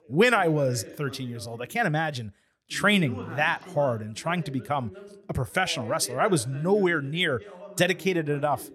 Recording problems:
voice in the background; noticeable; throughout; 15 dB below the speech

